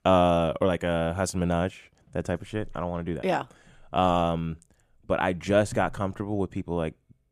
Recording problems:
none

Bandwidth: 14.5 kHz